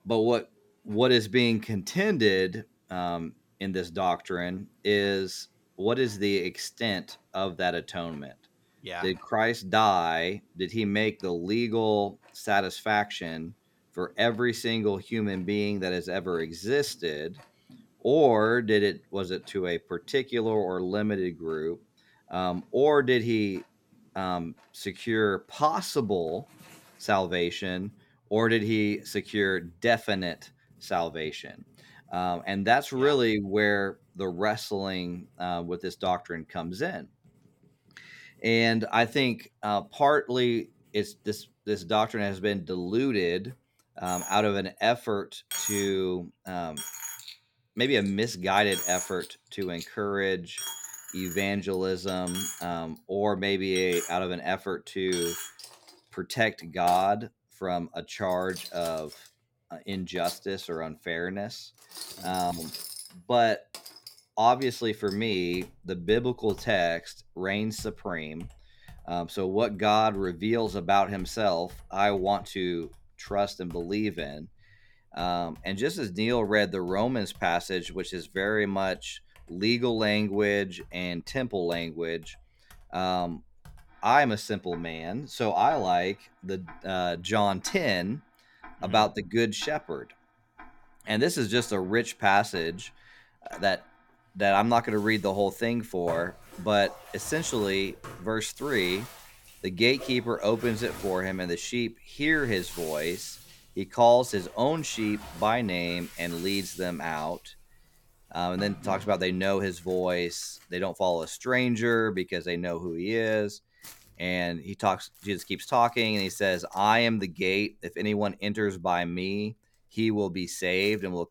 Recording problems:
household noises; noticeable; throughout; 15 dB below the speech

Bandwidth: 17 kHz